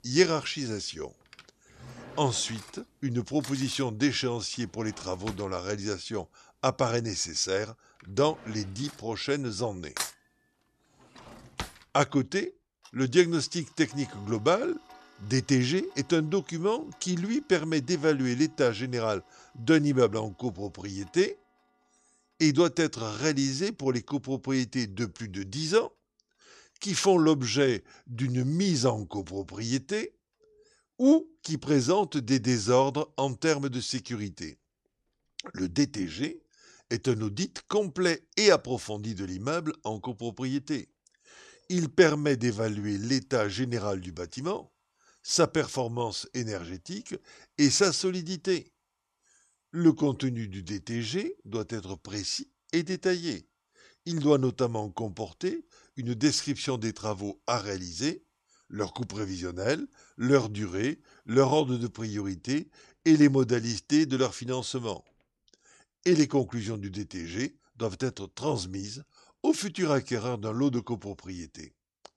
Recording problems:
household noises; noticeable; throughout; 20 dB below the speech

